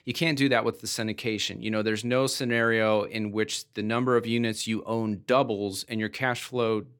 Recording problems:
none

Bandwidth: 17.5 kHz